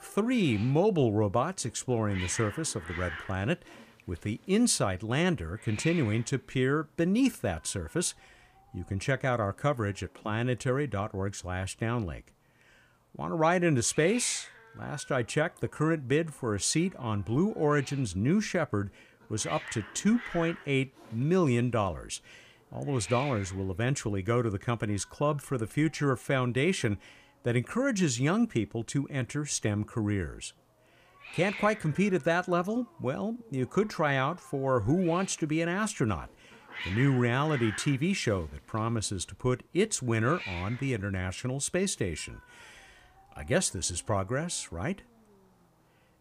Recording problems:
hiss; noticeable; throughout; 15 dB below the speech

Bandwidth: 15 kHz